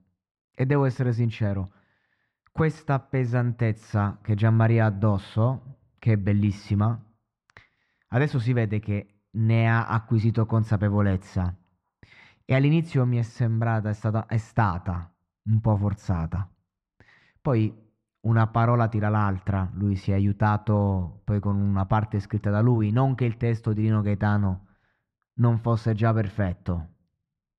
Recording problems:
muffled; very; fading above 1.5 kHz

